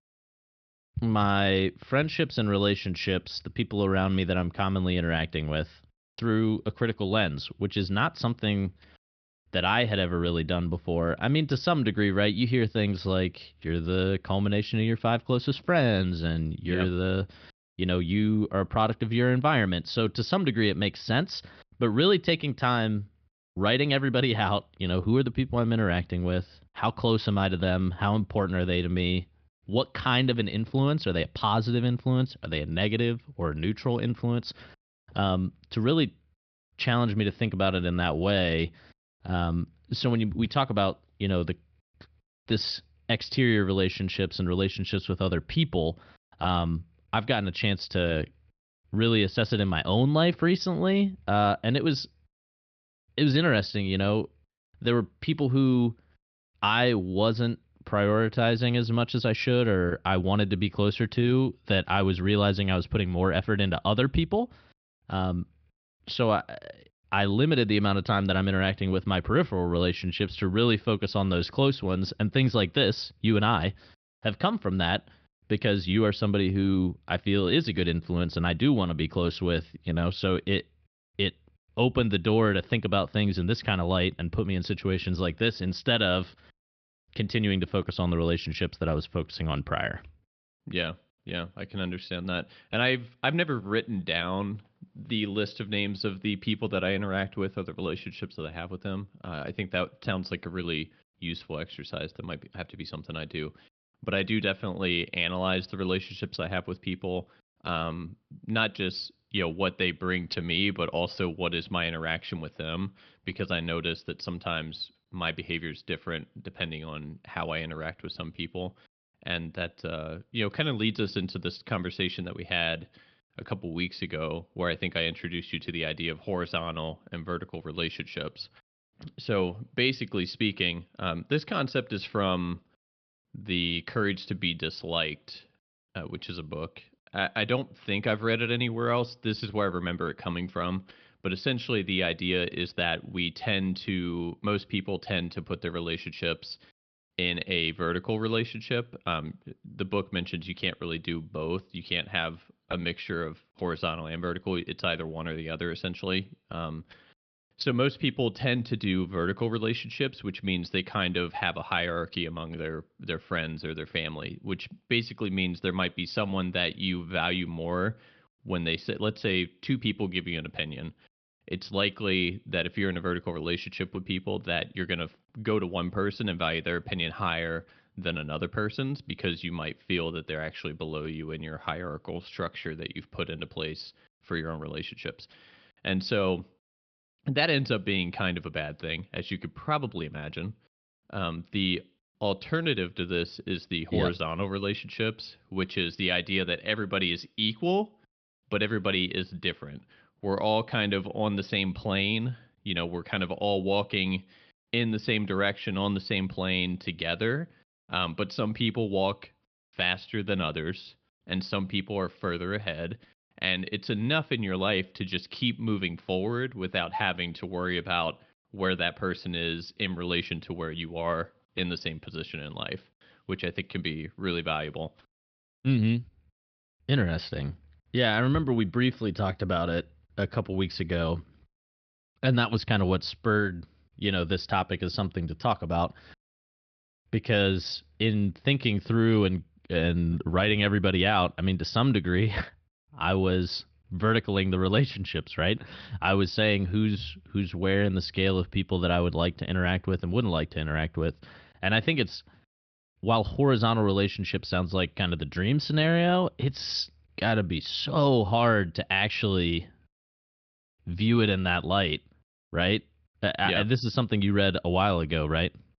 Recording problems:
high frequencies cut off; noticeable; nothing above 5.5 kHz

